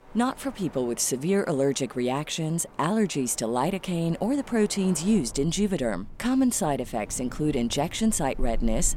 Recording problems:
wind in the background; noticeable; throughout; 20 dB below the speech

